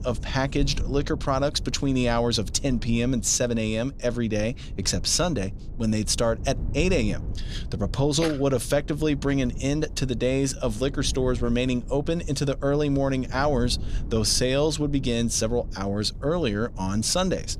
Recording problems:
low rumble; faint; throughout; 20 dB below the speech

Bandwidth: 15.5 kHz